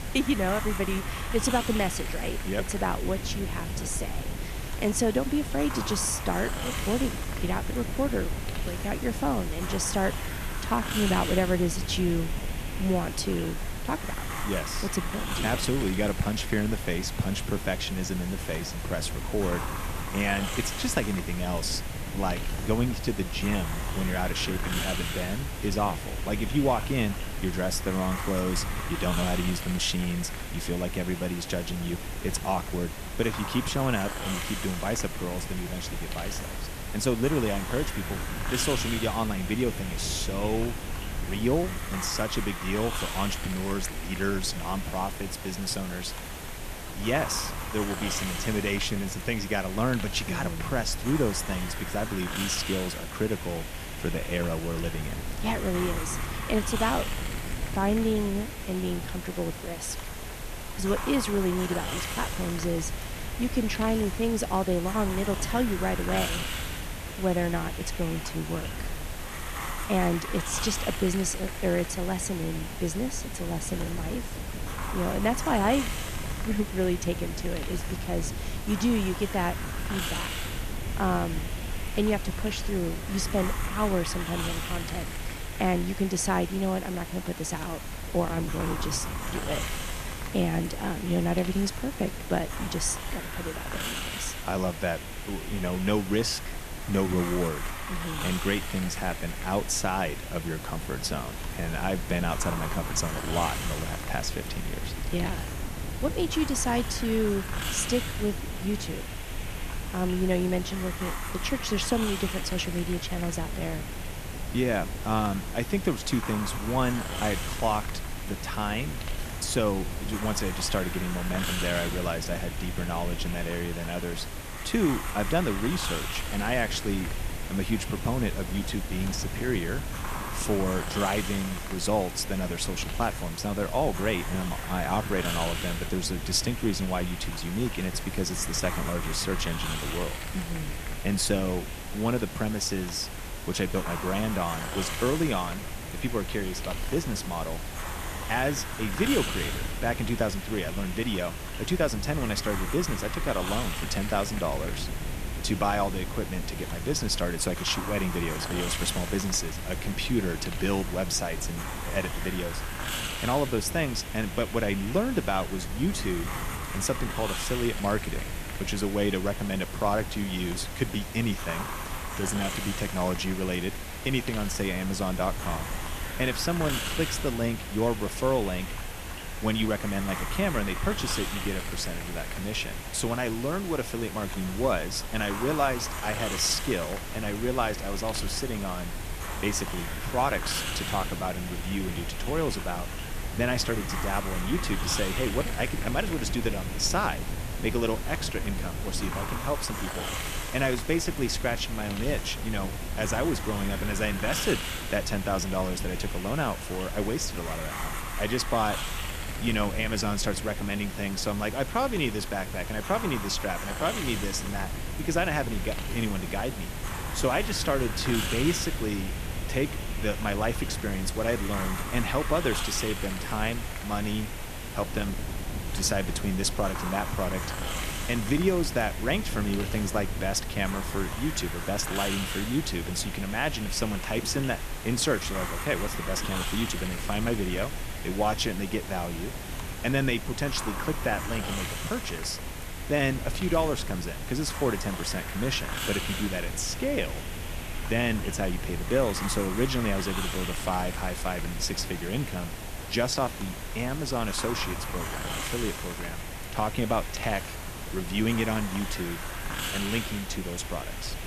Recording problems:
hiss; loud; throughout; 6 dB below the speech
wind noise on the microphone; occasional gusts; 20 dB below the speech

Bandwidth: 14.5 kHz